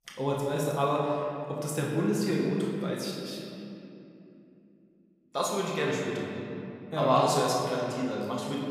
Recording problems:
off-mic speech; far
room echo; noticeable; dies away in 2.6 s

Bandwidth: 15.5 kHz